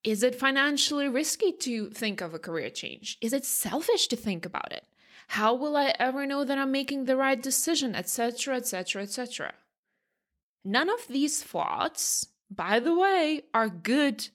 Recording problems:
uneven, jittery; strongly; from 0.5 to 13 s

